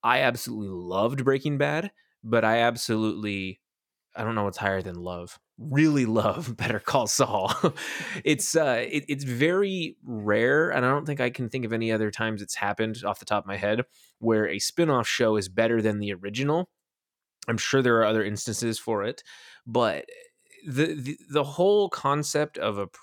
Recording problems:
none

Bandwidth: 18 kHz